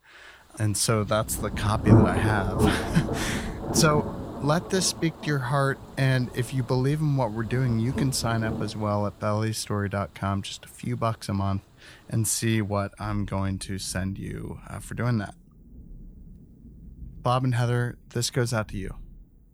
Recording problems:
rain or running water; loud; throughout; 2 dB below the speech

